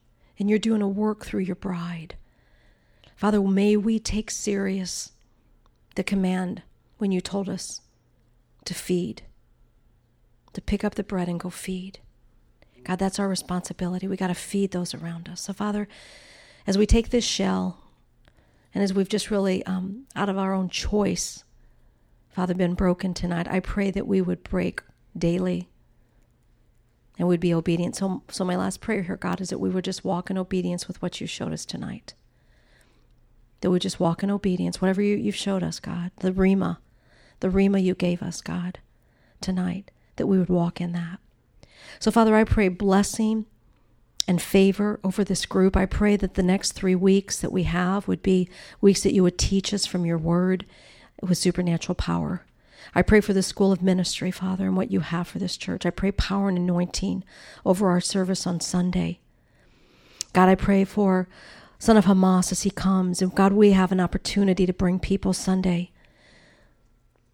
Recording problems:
none

